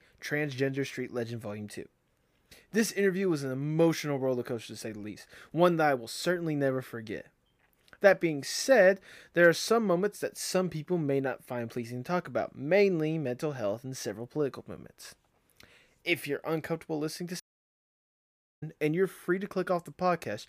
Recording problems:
audio cutting out; at 17 s for 1 s

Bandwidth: 15 kHz